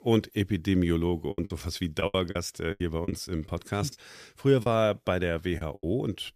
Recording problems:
choppy; very; 10% of the speech affected

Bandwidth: 14.5 kHz